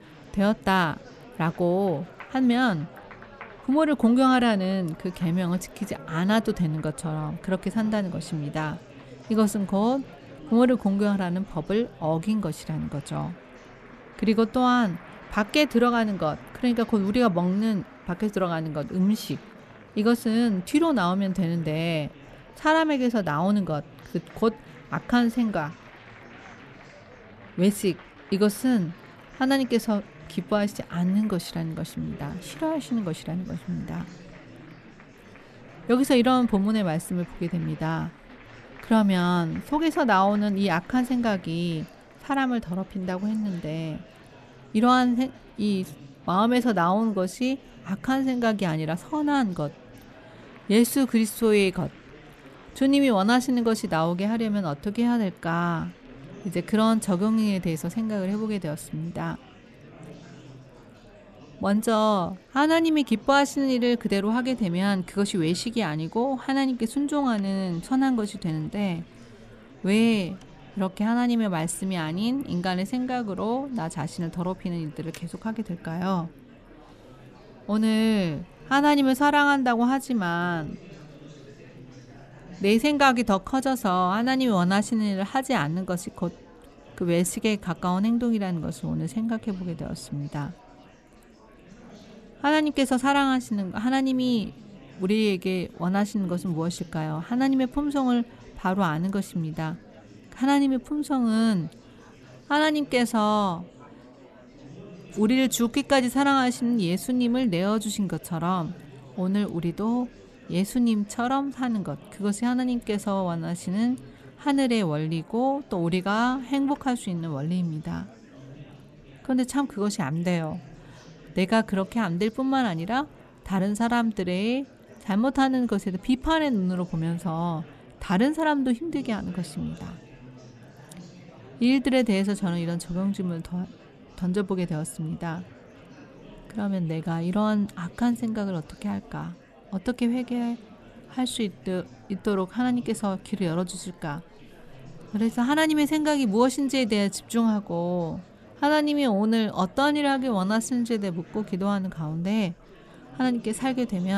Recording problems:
murmuring crowd; faint; throughout; 20 dB below the speech
abrupt cut into speech; at the end

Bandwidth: 13.5 kHz